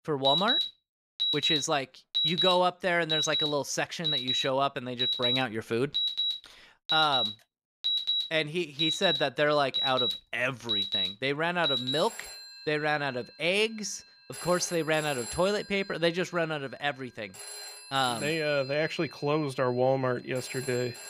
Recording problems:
alarms or sirens; very loud; throughout; as loud as the speech

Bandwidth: 15 kHz